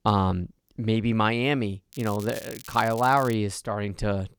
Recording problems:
crackling; noticeable; from 2 to 3.5 s; 15 dB below the speech

